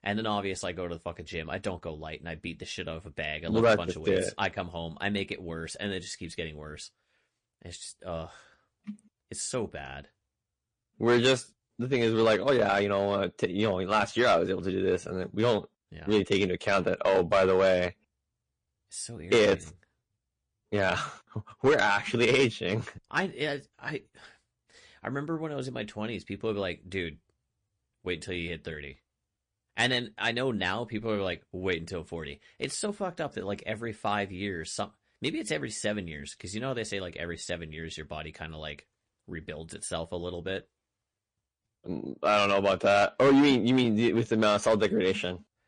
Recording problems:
distortion; slight; 1.8% of the sound clipped
garbled, watery; slightly; nothing above 9 kHz

